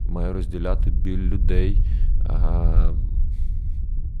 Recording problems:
low rumble; noticeable; throughout; 10 dB below the speech

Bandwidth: 14 kHz